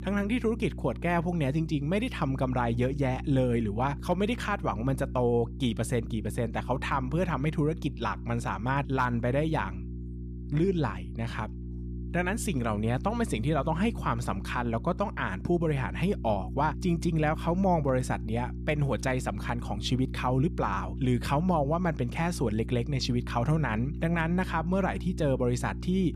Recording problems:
electrical hum; noticeable; throughout; 60 Hz, 15 dB below the speech

